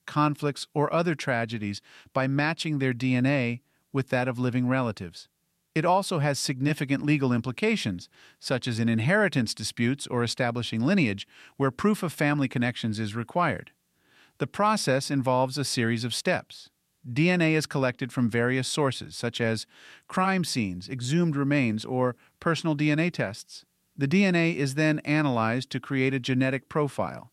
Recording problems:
none

